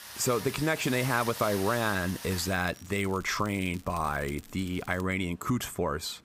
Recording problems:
rain or running water; loud; throughout; 9 dB below the speech
crackling; faint; from 2 to 5 s; 25 dB below the speech

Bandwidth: 15.5 kHz